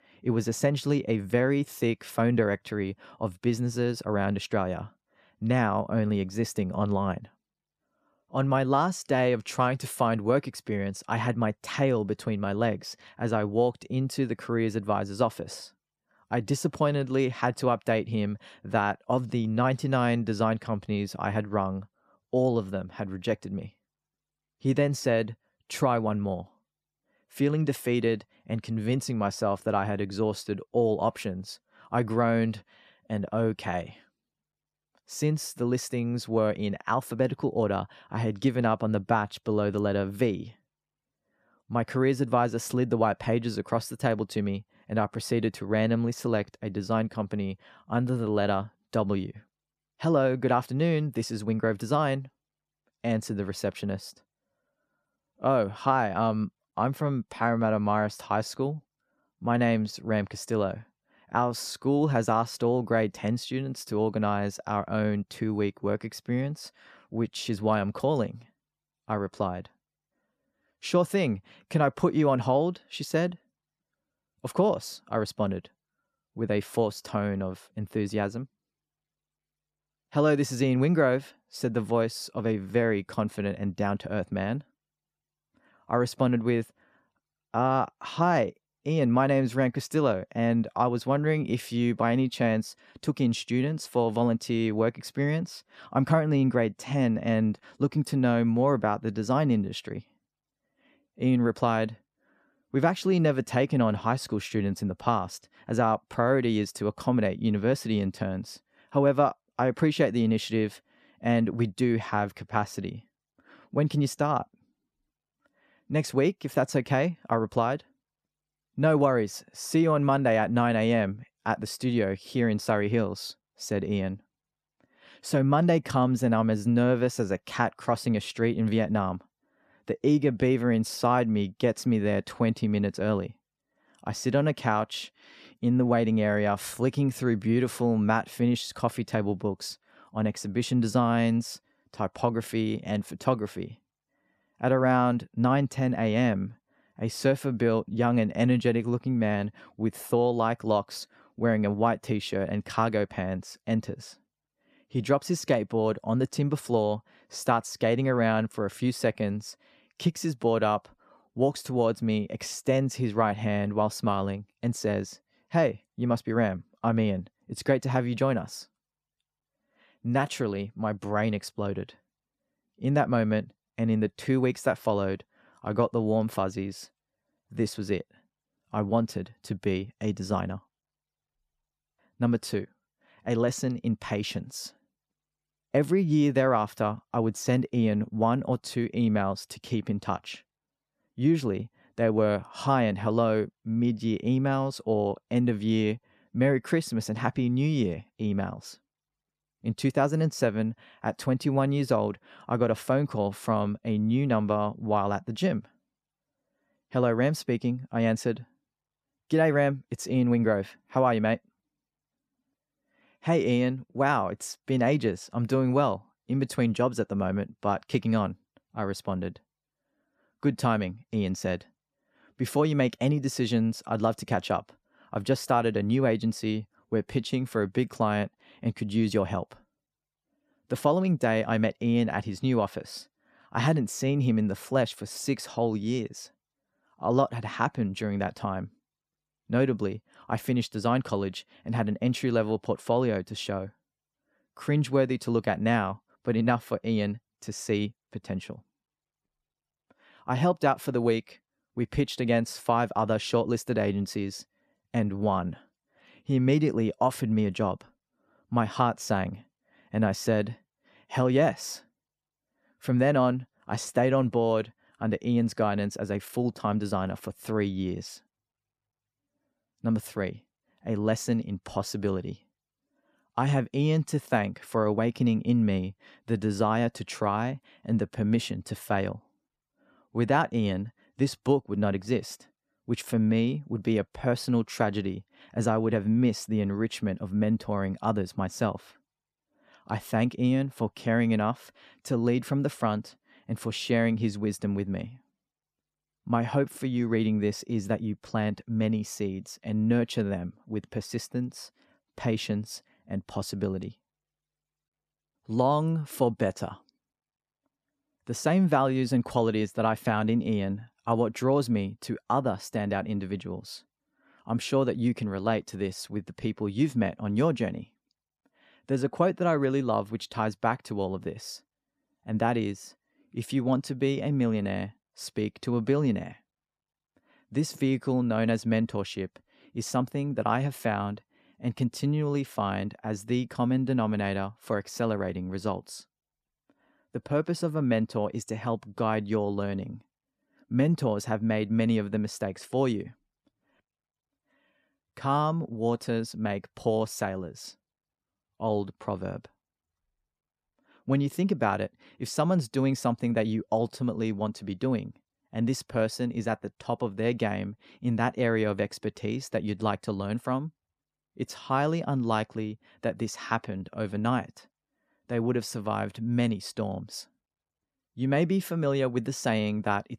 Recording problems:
none

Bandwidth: 14 kHz